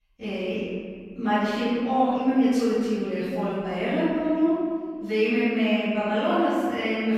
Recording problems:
room echo; strong; dies away in 1.7 s
off-mic speech; far

